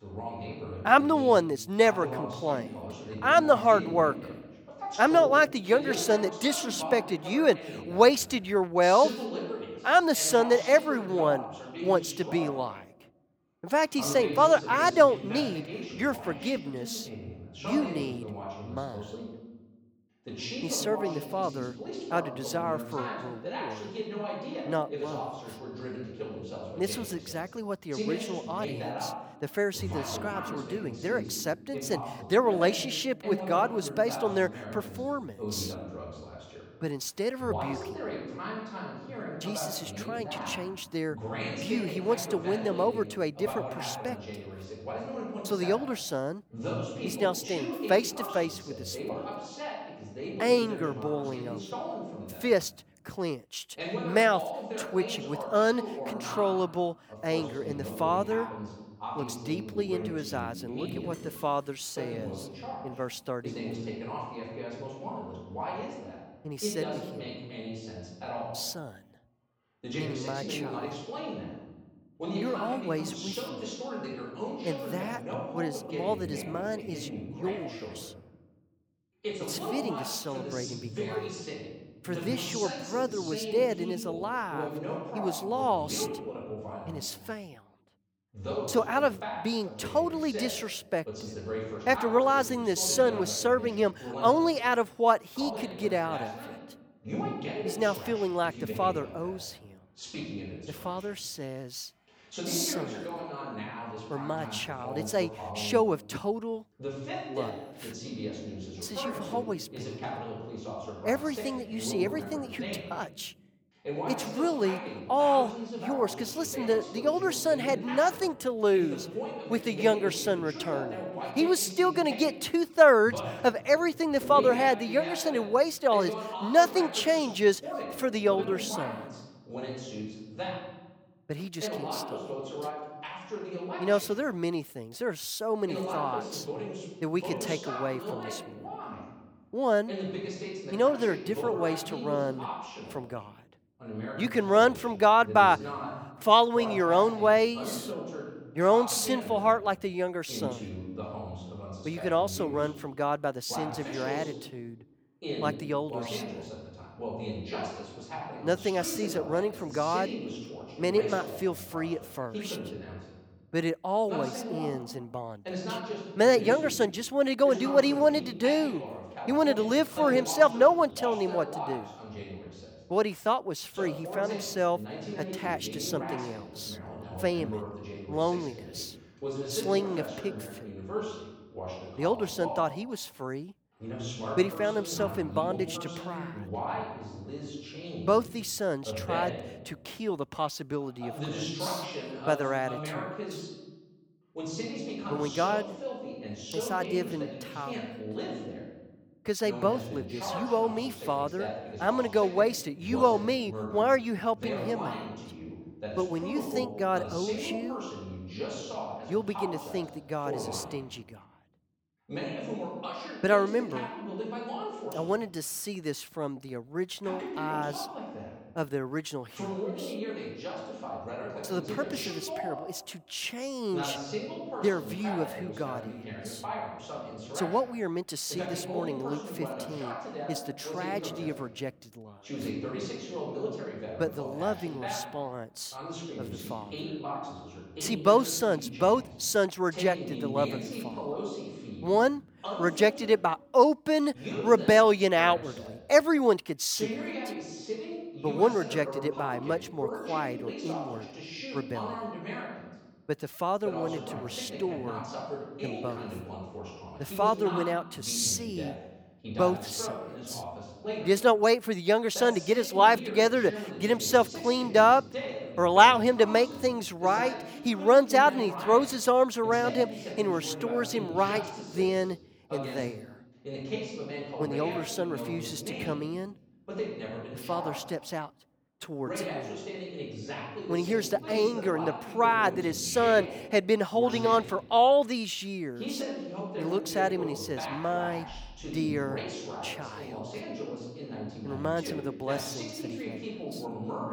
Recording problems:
voice in the background; loud; throughout; 10 dB below the speech

